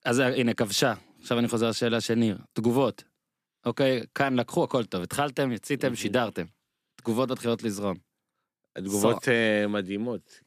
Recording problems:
none

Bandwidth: 14.5 kHz